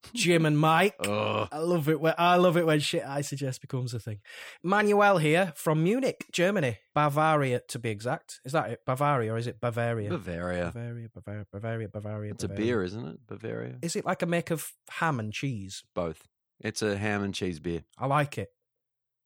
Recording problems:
none

